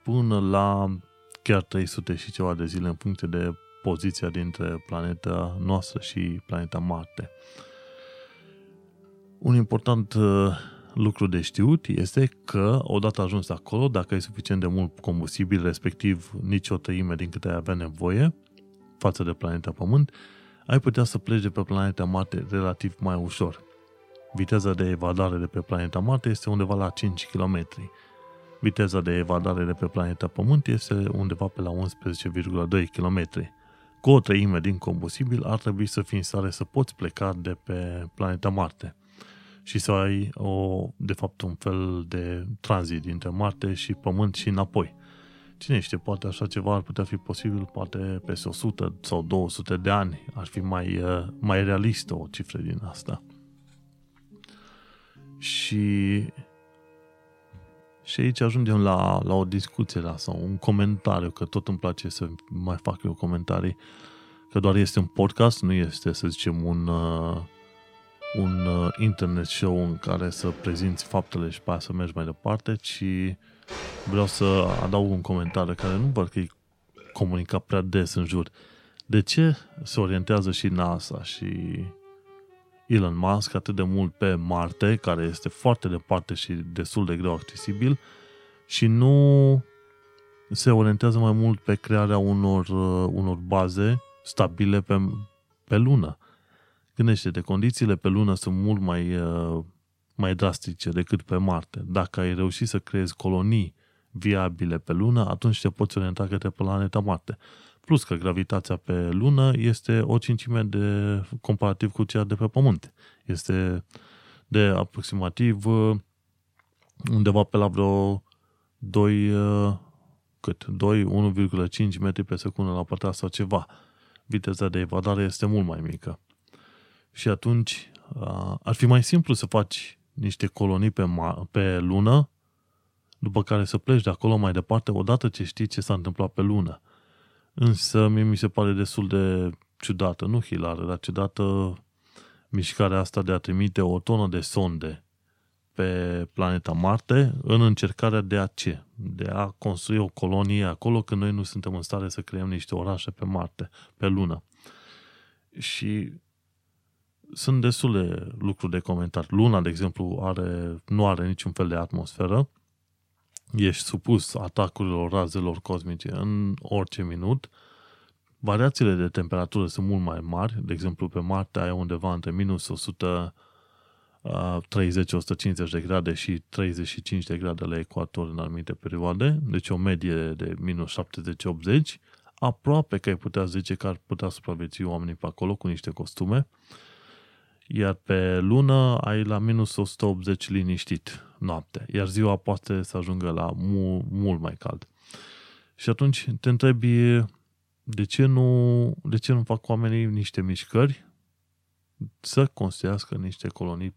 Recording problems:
background music; faint; until 1:35; 25 dB below the speech

